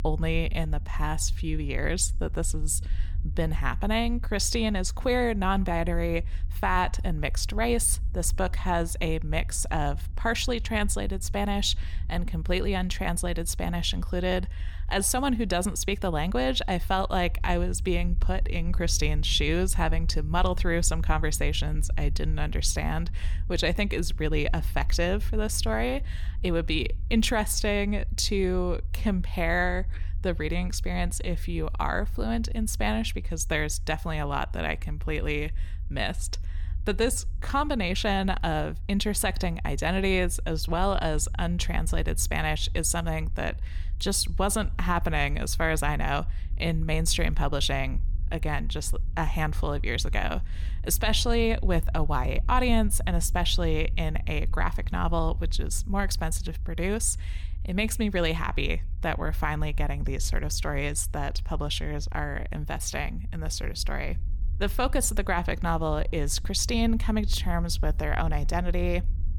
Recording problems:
low rumble; faint; throughout; 25 dB below the speech

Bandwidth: 18 kHz